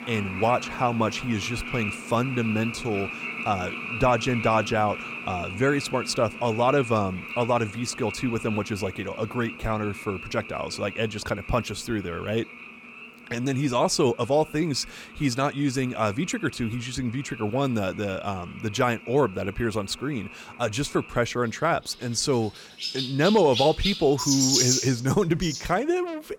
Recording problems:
animal sounds; loud; throughout; 6 dB below the speech

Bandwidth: 17.5 kHz